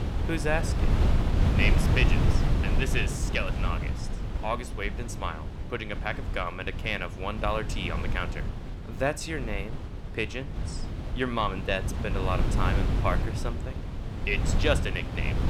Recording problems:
wind noise on the microphone; heavy; 8 dB below the speech
voice in the background; faint; throughout; 30 dB below the speech

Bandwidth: 18 kHz